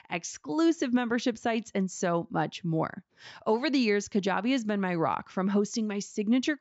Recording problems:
high frequencies cut off; noticeable; nothing above 8 kHz

